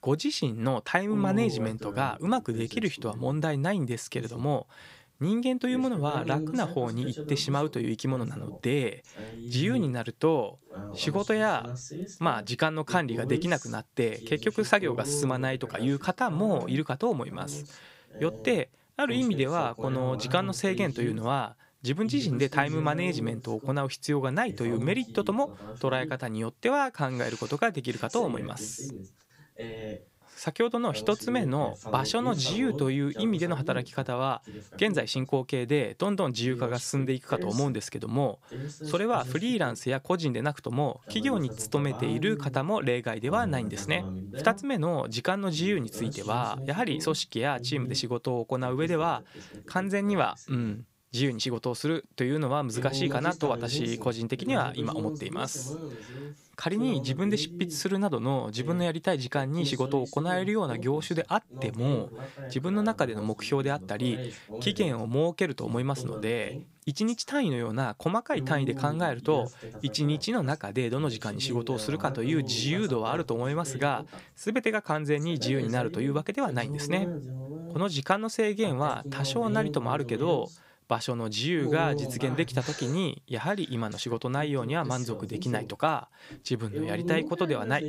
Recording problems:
voice in the background; loud; throughout; 10 dB below the speech

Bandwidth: 15.5 kHz